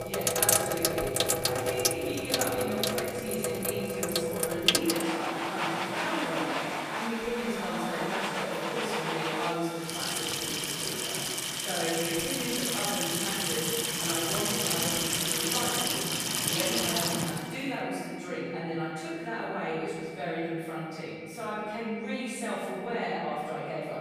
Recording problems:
room echo; strong; dies away in 2.3 s
off-mic speech; far
household noises; very loud; until 18 s; 5 dB above the speech
high-pitched whine; noticeable; throughout; 2.5 kHz, 15 dB below the speech

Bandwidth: 15 kHz